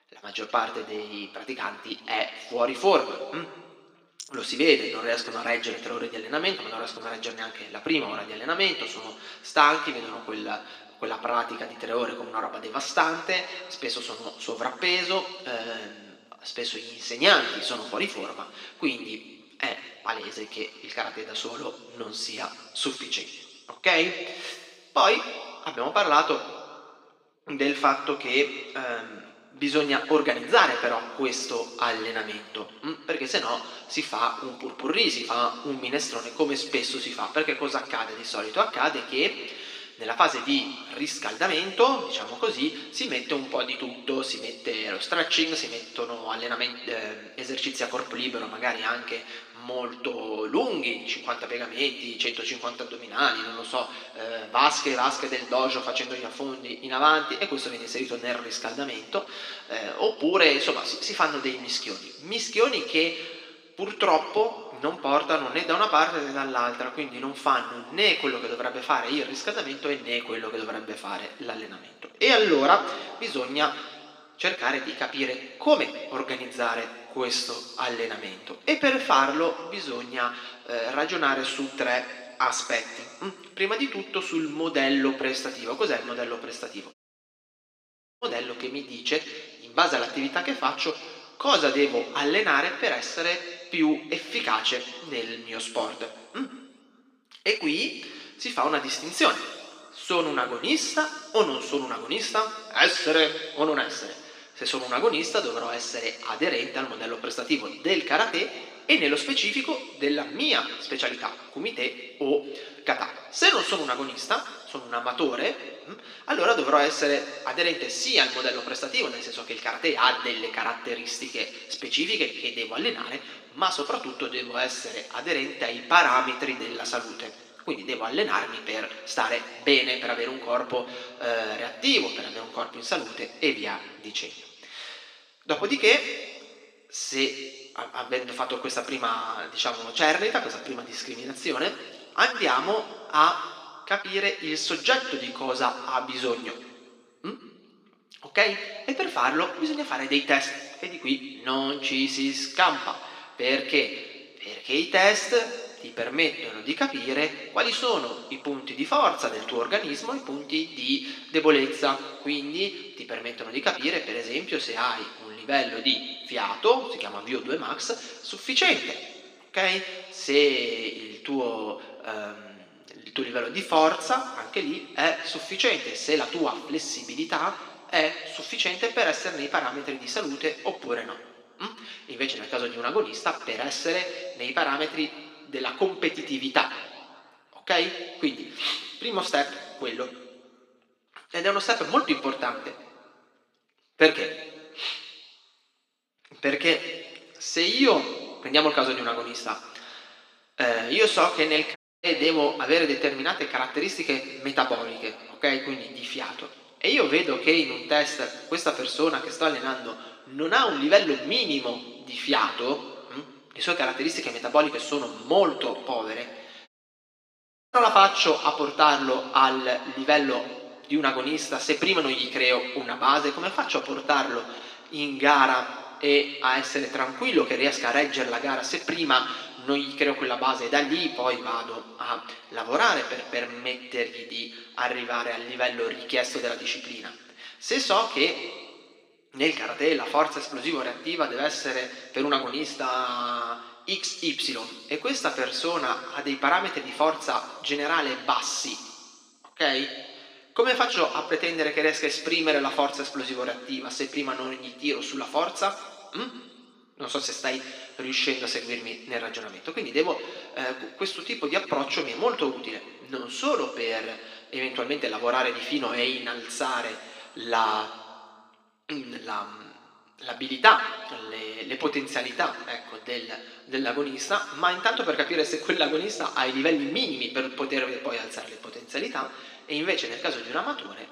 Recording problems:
thin; somewhat; fading below 300 Hz
room echo; slight; dies away in 1.6 s
off-mic speech; somewhat distant
audio cutting out; at 1:27 for 1.5 s, at 3:22 and at 3:37 for 1 s

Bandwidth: 15 kHz